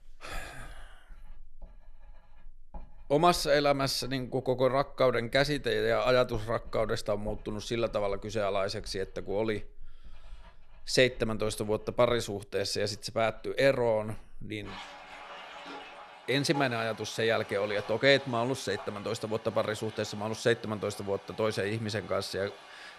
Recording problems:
household noises; noticeable; throughout; 20 dB below the speech

